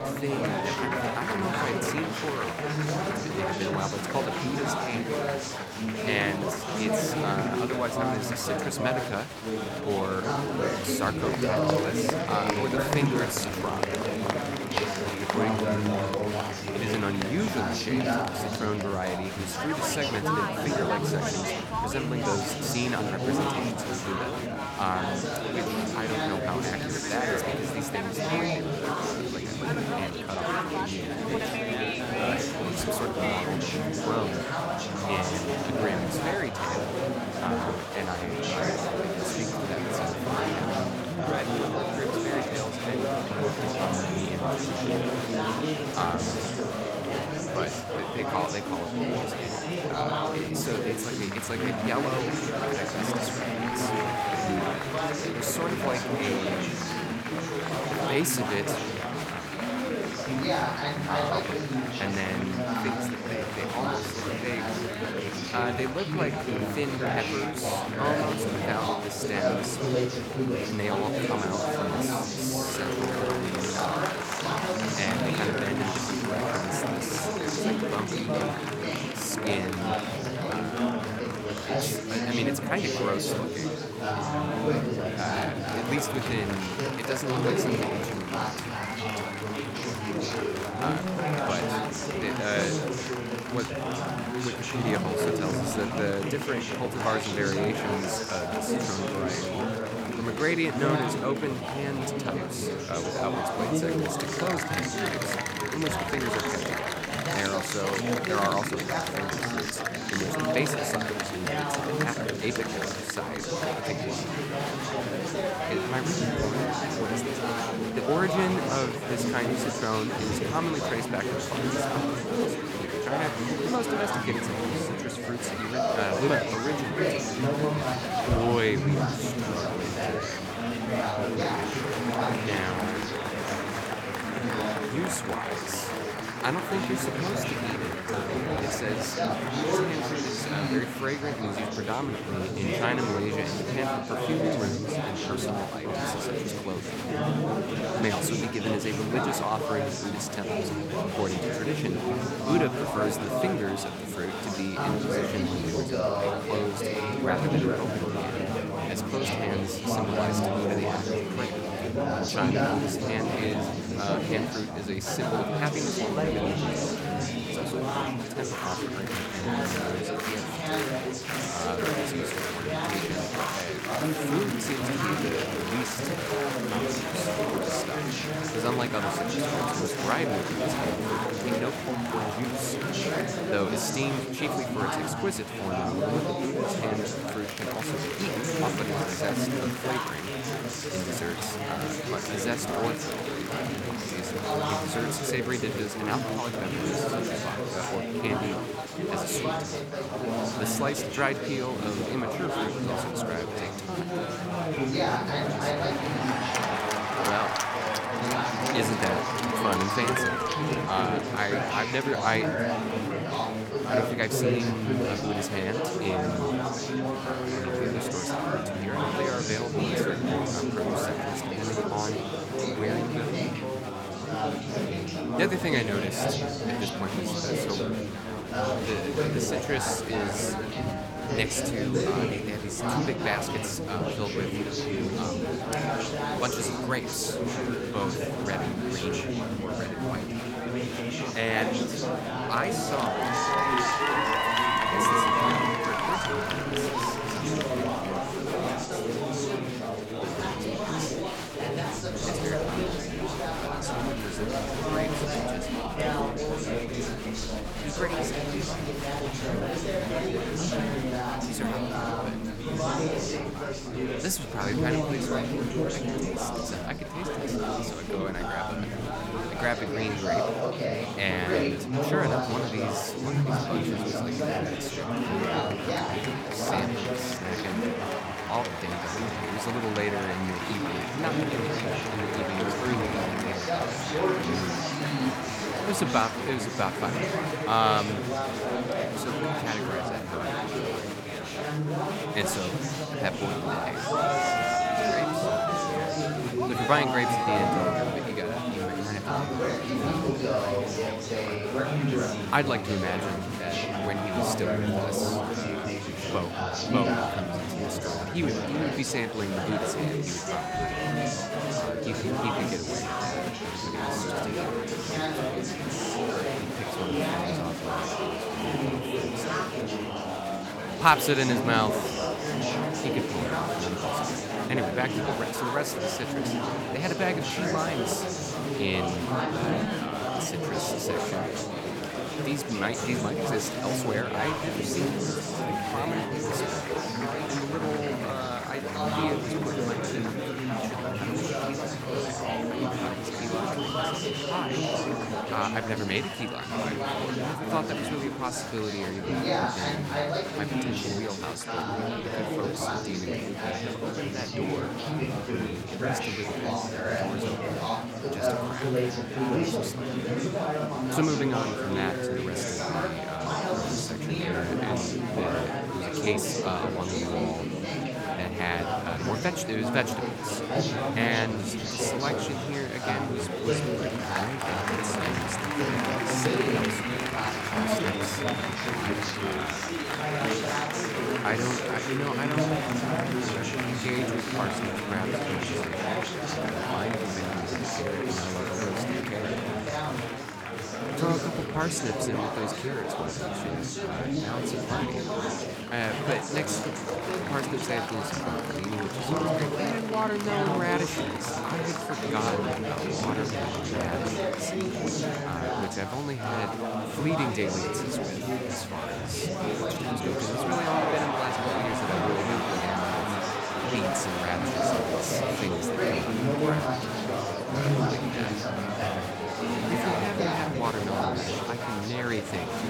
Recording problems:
chatter from many people; very loud; throughout; 4 dB above the speech

